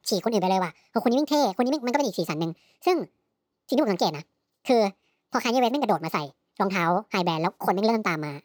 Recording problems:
wrong speed and pitch; too fast and too high; 1.5 times normal speed

